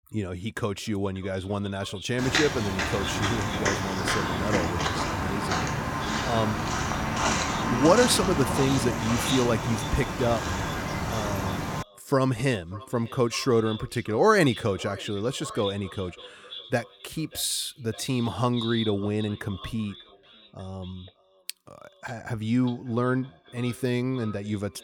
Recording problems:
echo of what is said; noticeable; throughout; 590 ms later, 15 dB below the speech
footsteps; loud; from 2 to 12 s; peak 3 dB above the speech

